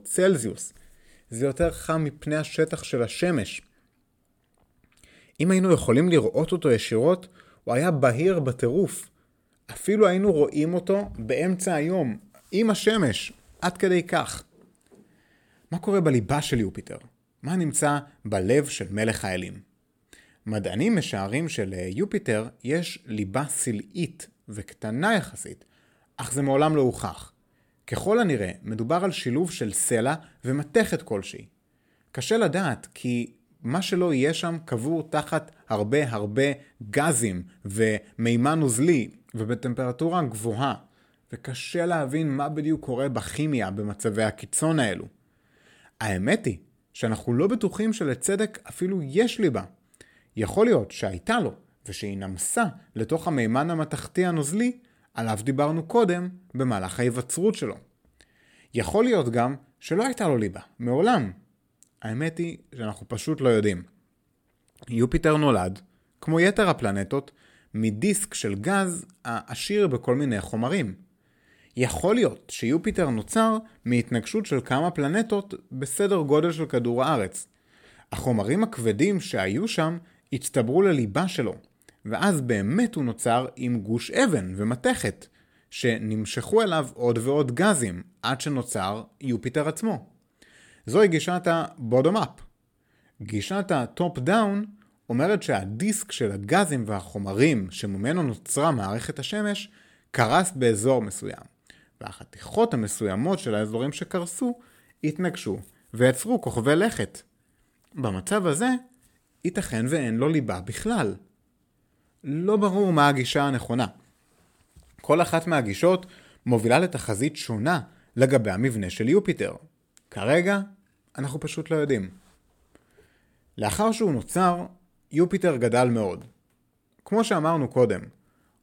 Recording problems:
none

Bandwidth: 17 kHz